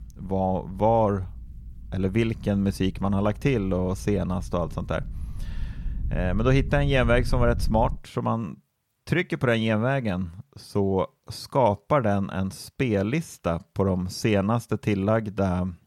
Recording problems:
low rumble; faint; until 8 s; 25 dB below the speech

